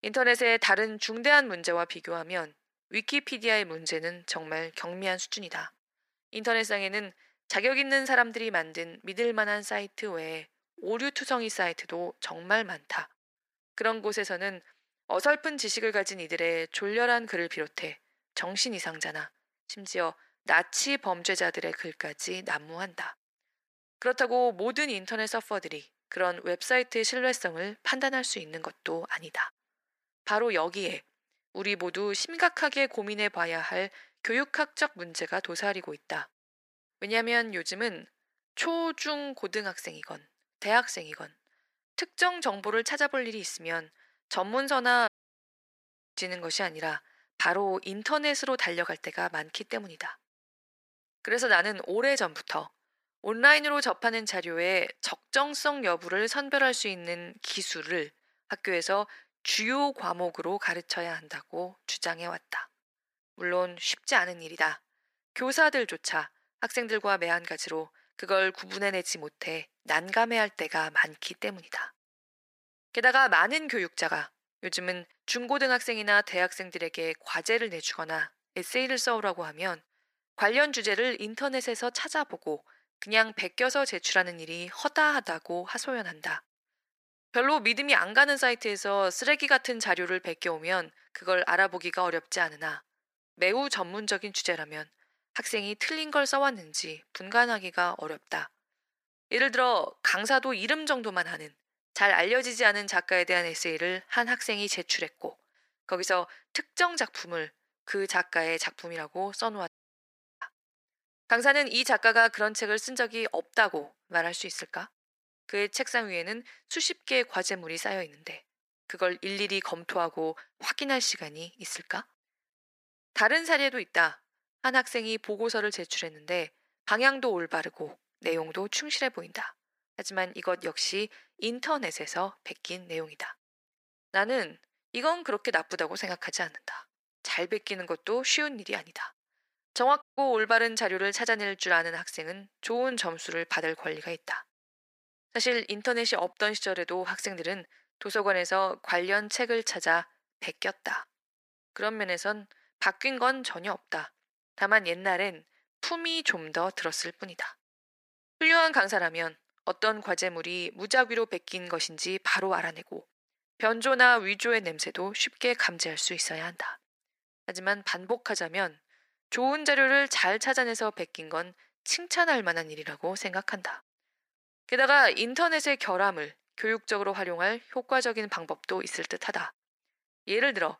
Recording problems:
thin; very; fading below 450 Hz
audio cutting out; at 45 s for 1 s, at 1:50 for 0.5 s and at 2:20

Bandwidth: 15 kHz